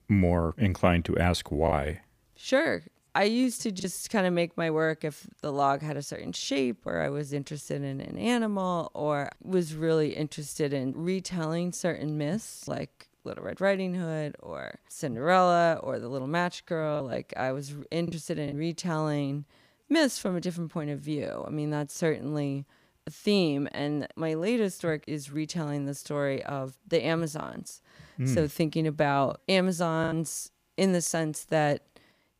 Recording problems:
choppy; occasionally; from 1.5 to 4 s, from 17 to 19 s and at 30 s; 3% of the speech affected

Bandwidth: 15 kHz